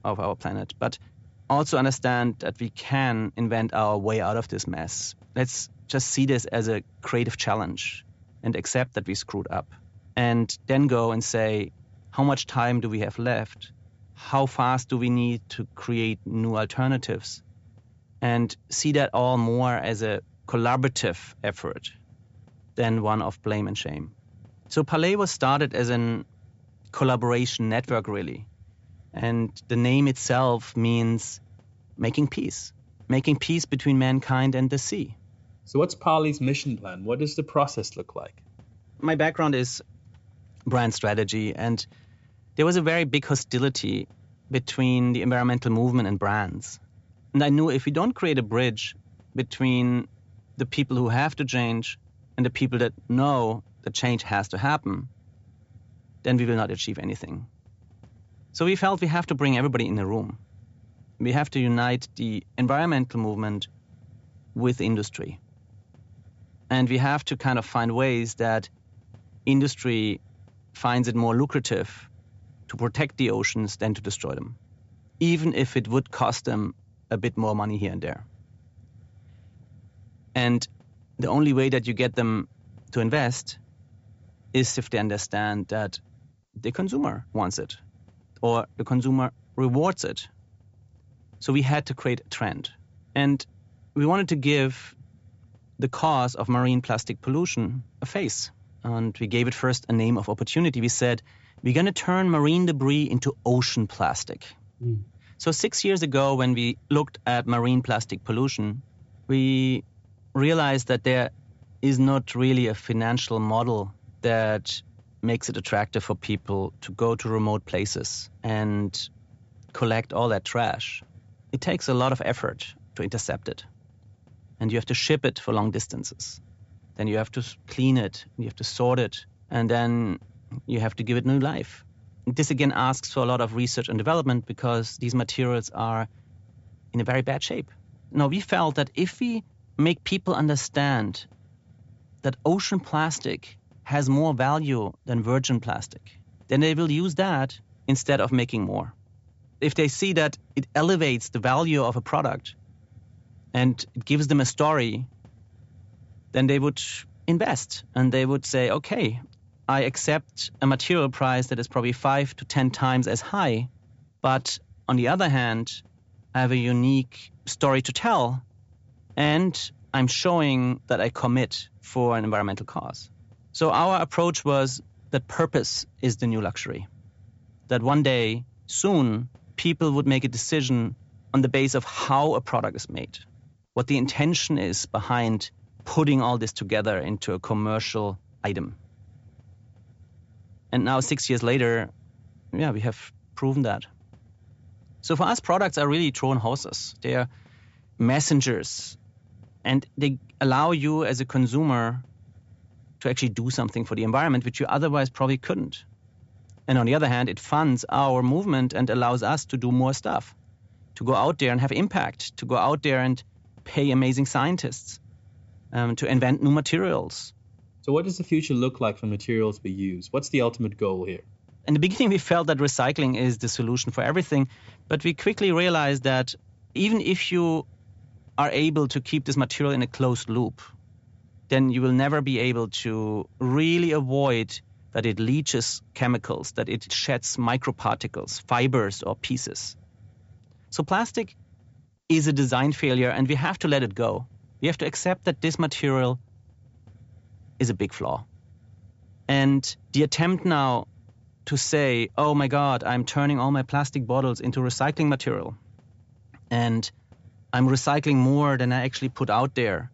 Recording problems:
high frequencies cut off; noticeable; nothing above 8 kHz
hiss; faint; throughout; 30 dB below the speech

